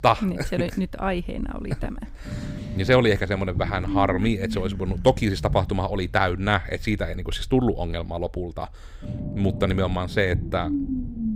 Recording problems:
low rumble; noticeable; throughout; 15 dB below the speech

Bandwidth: 15.5 kHz